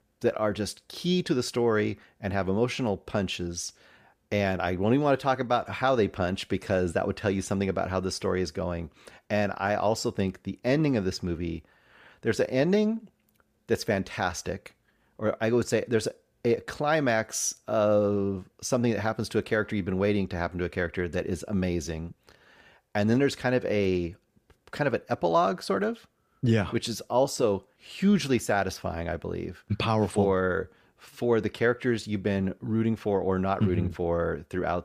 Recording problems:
none

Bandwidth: 15 kHz